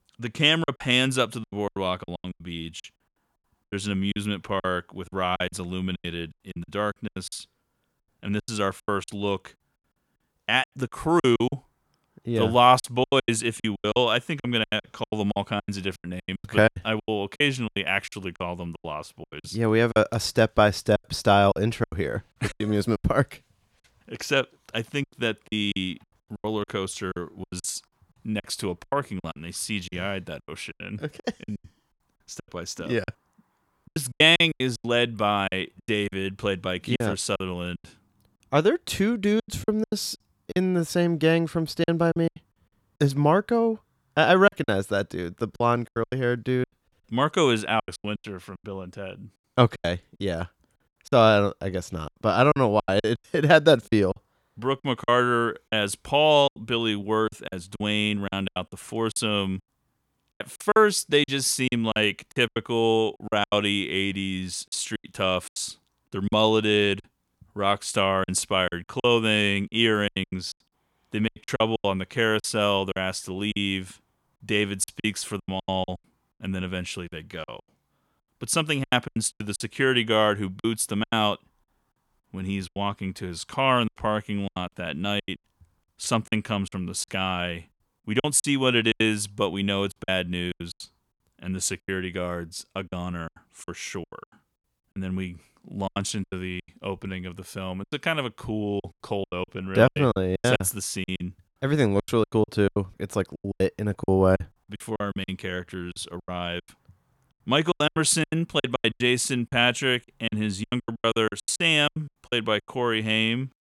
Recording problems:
choppy; very; 15% of the speech affected

